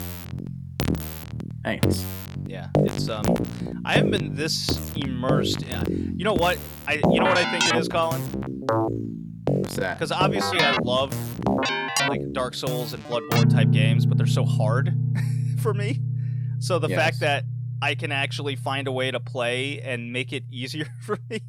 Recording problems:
background music; very loud; throughout; 2 dB above the speech

